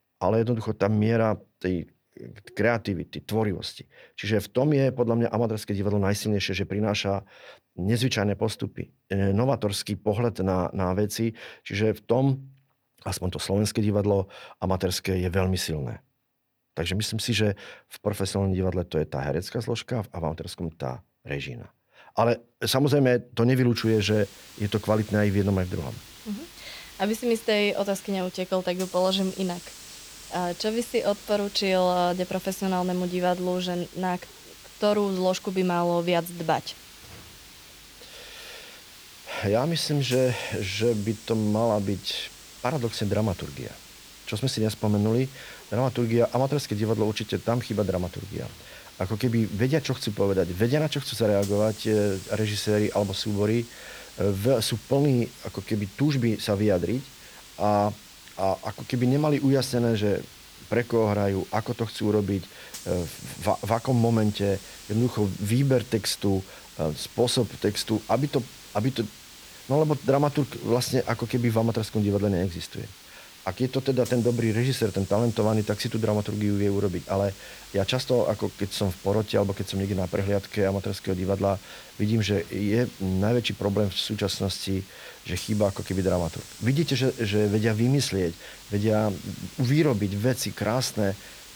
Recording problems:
hiss; noticeable; from 24 s on; 15 dB below the speech

